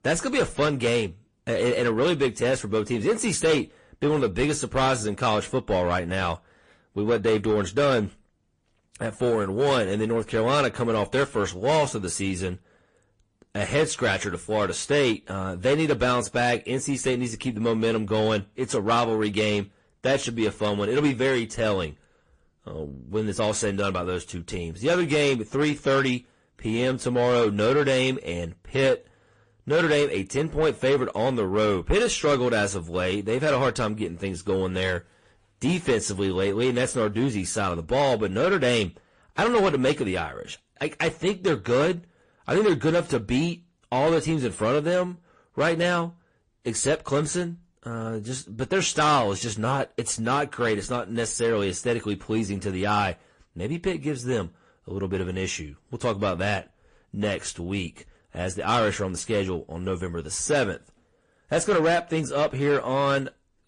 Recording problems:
distortion; slight; 10 dB below the speech
garbled, watery; slightly; nothing above 9 kHz

